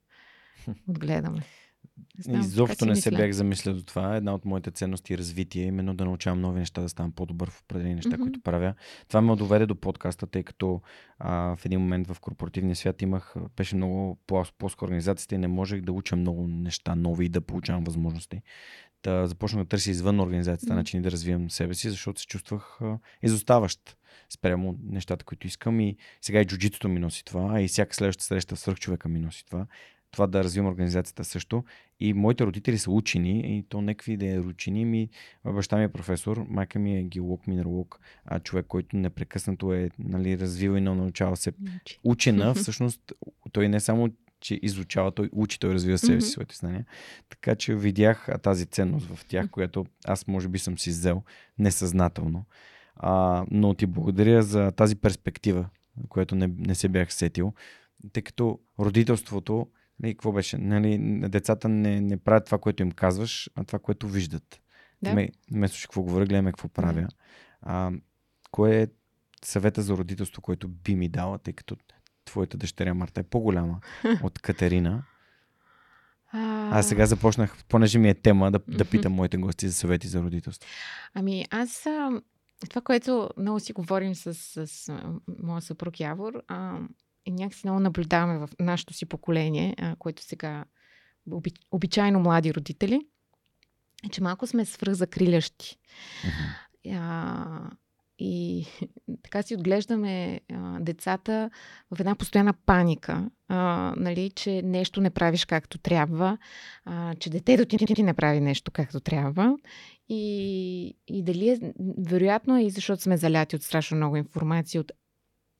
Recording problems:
audio stuttering; at 1:48

